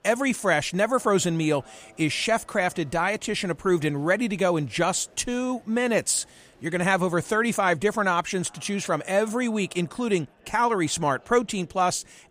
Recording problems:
murmuring crowd; faint; throughout; 30 dB below the speech

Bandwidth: 15 kHz